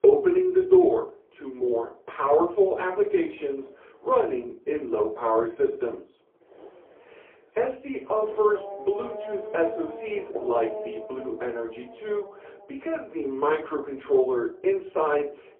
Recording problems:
phone-call audio; poor line
off-mic speech; far
muffled; very; fading above 1 kHz
room echo; very slight; dies away in 0.2 s
traffic noise; noticeable; throughout; 15 dB below the speech

